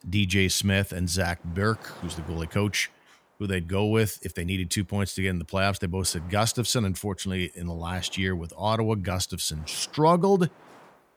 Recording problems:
wind noise on the microphone; occasional gusts; 25 dB below the speech

